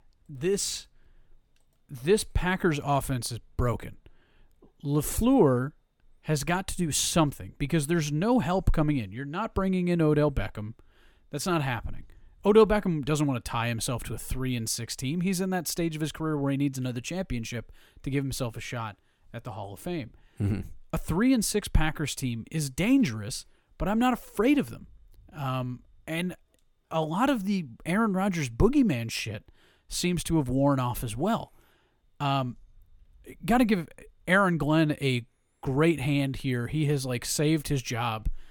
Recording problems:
none

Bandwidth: 18 kHz